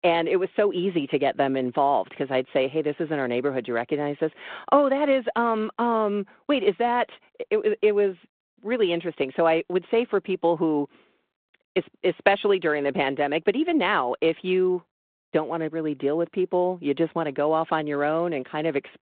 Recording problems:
phone-call audio

